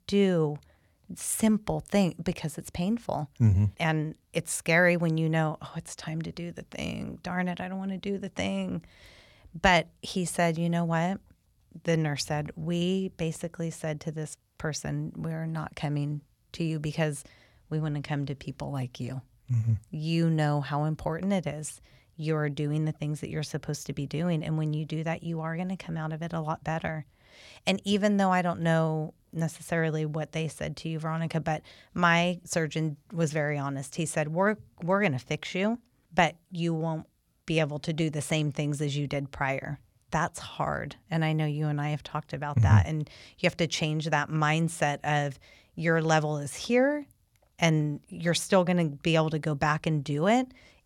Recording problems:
none

